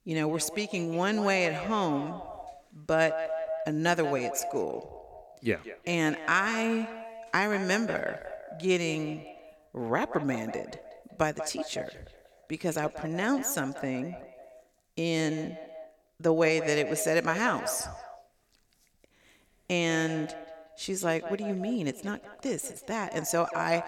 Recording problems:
echo of what is said; strong; throughout; 190 ms later, 10 dB below the speech

